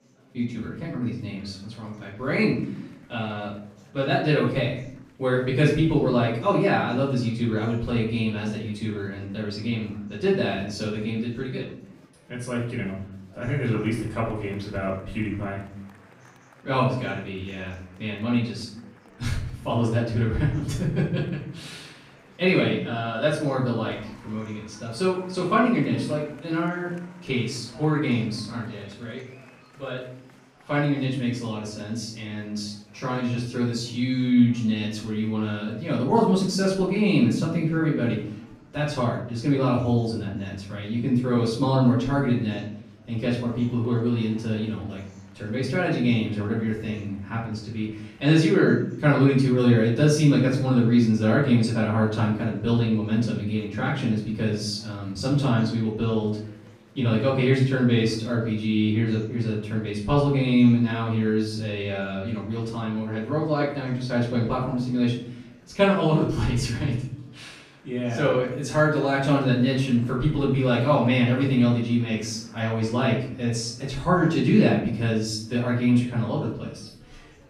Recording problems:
off-mic speech; far
room echo; noticeable; dies away in 0.6 s
murmuring crowd; faint; throughout; 30 dB below the speech

